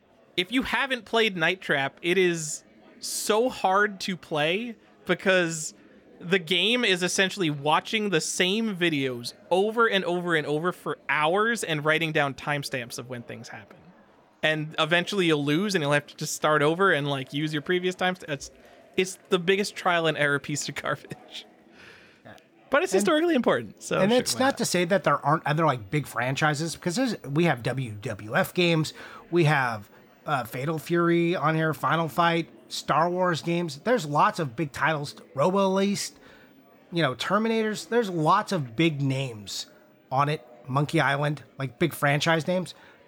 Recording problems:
murmuring crowd; faint; throughout; 30 dB below the speech

